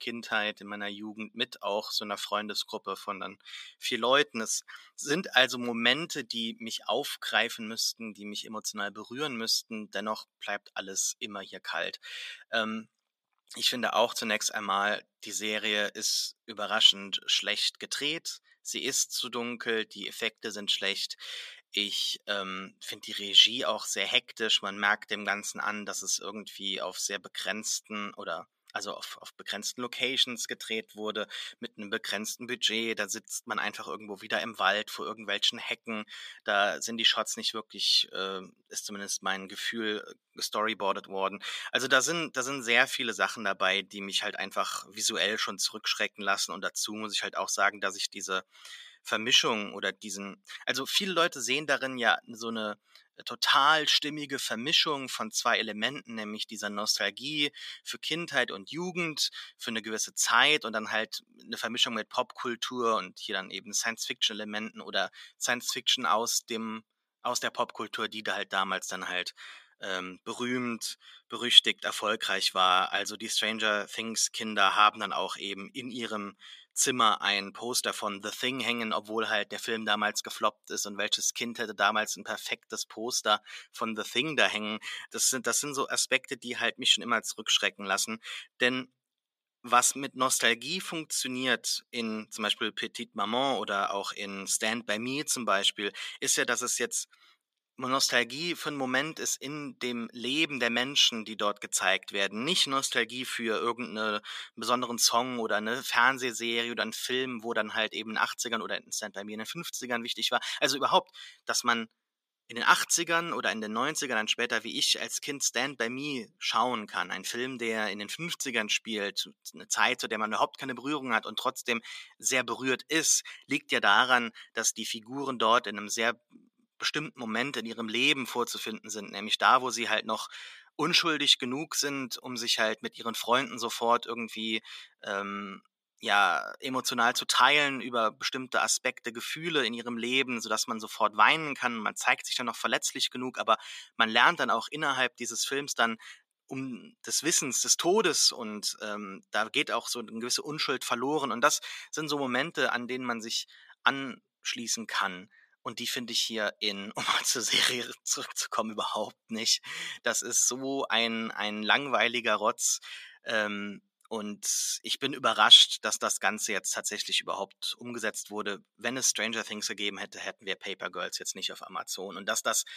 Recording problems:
thin; very; fading below 550 Hz

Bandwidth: 14.5 kHz